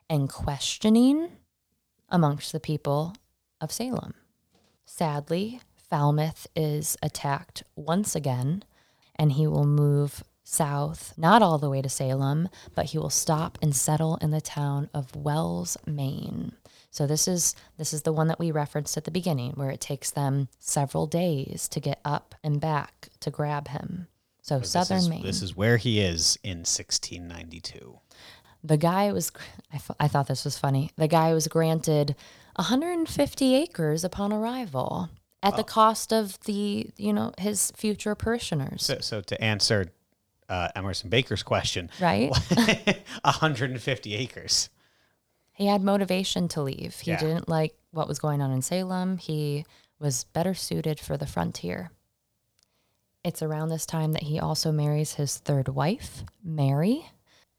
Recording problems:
none

